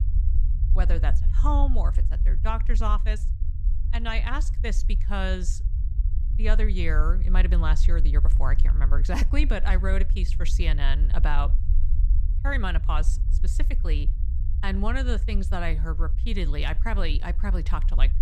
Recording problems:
low rumble; noticeable; throughout; 15 dB below the speech

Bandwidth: 14.5 kHz